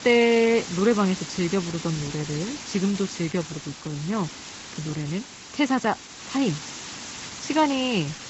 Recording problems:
high frequencies cut off; noticeable; nothing above 7.5 kHz
garbled, watery; slightly
hiss; noticeable; throughout; 10 dB below the speech

